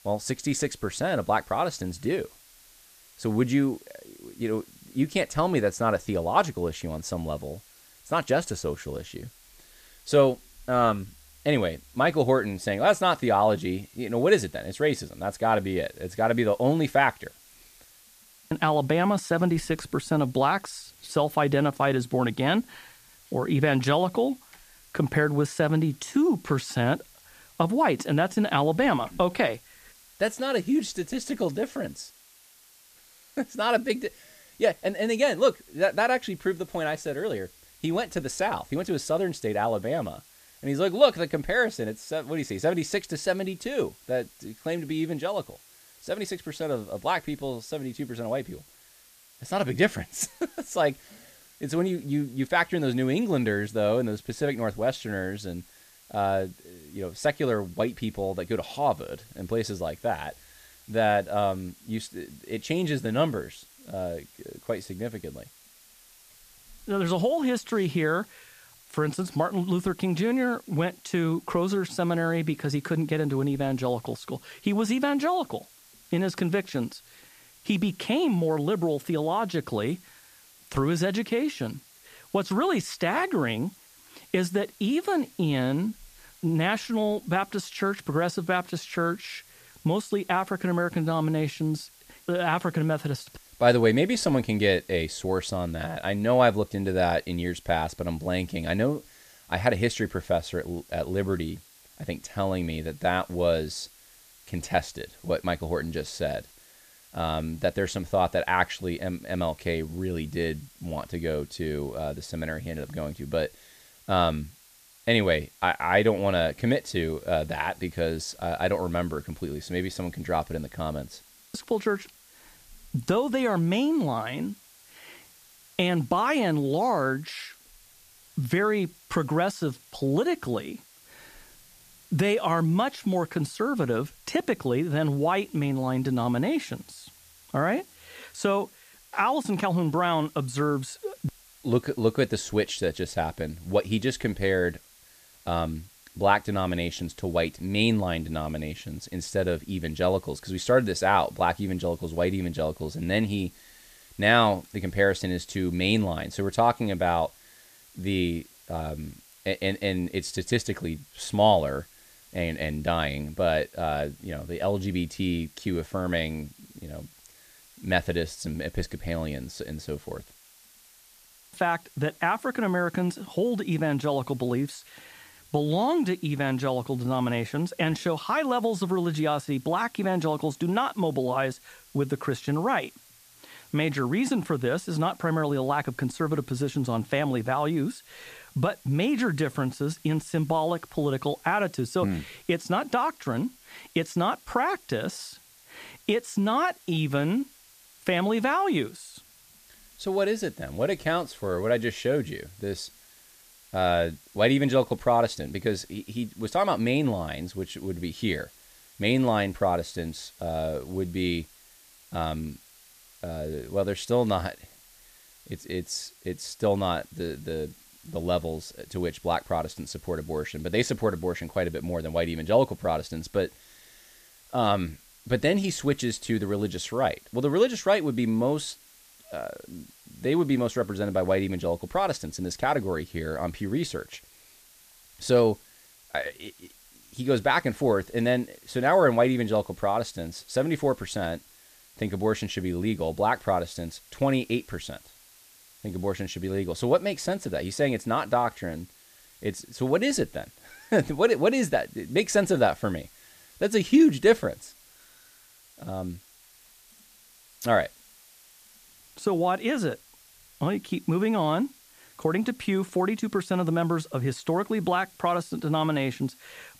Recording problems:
hiss; faint; throughout; 25 dB below the speech

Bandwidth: 14.5 kHz